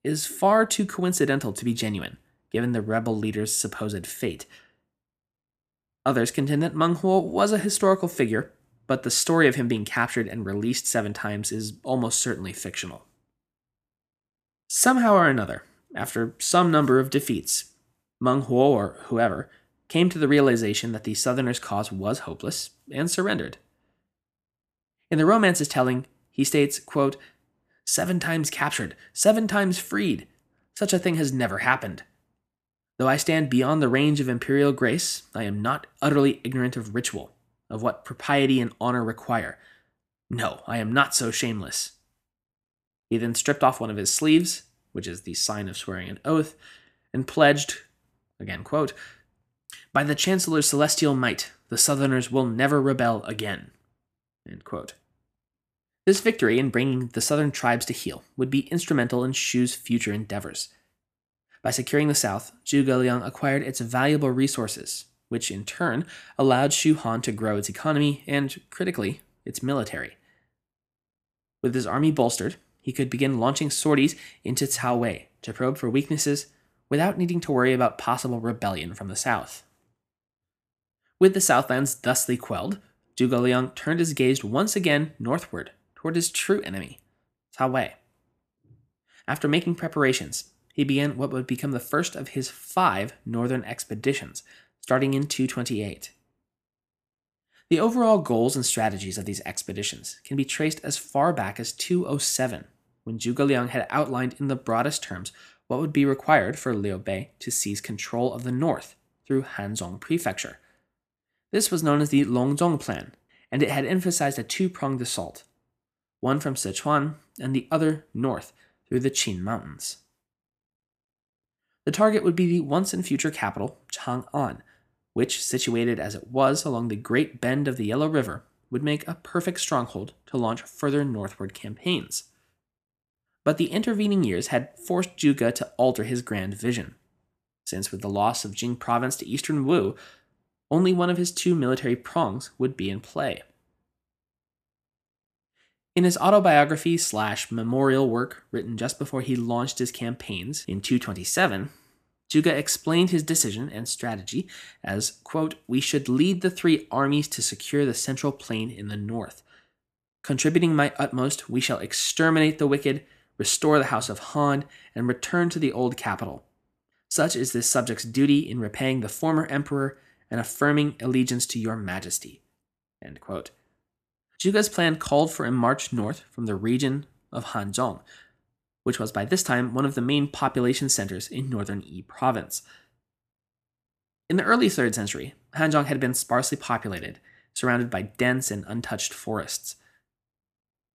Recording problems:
none

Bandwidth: 14.5 kHz